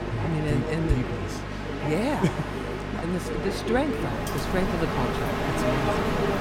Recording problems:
train or aircraft noise; loud; throughout; 1 dB below the speech
electrical hum; noticeable; throughout; 50 Hz, 15 dB below the speech

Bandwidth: 16 kHz